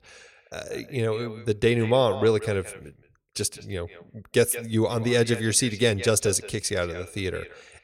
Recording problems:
echo of what is said; noticeable; throughout; 170 ms later, 15 dB below the speech

